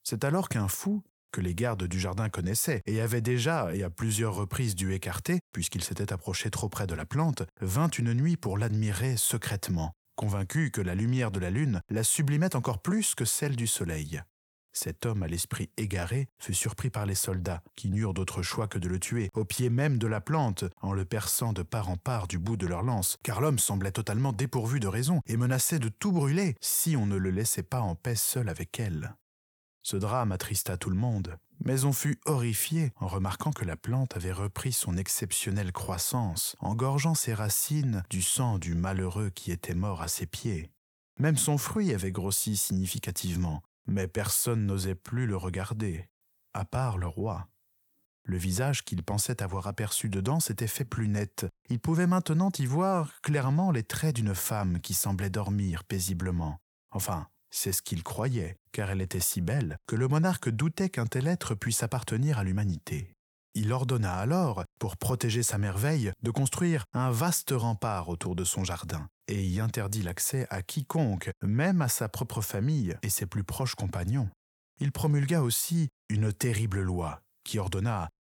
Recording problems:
none

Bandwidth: 19 kHz